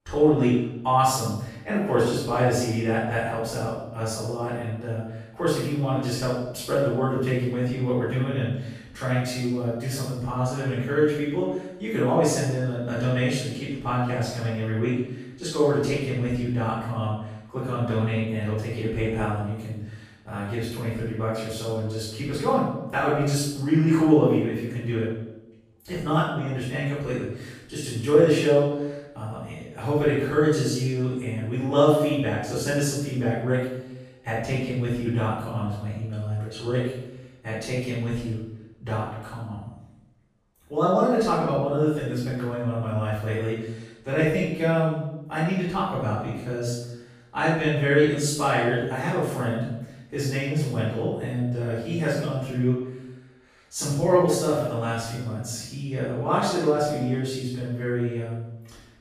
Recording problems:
room echo; strong; dies away in 0.8 s
off-mic speech; far

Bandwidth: 15 kHz